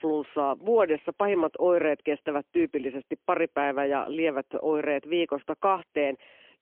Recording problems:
phone-call audio; poor line; nothing above 3 kHz

